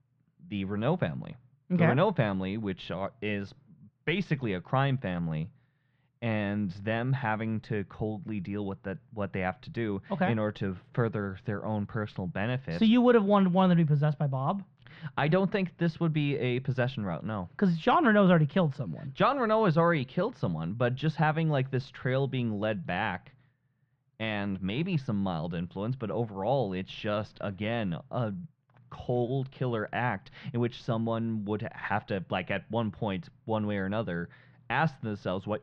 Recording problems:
muffled; very; fading above 2.5 kHz

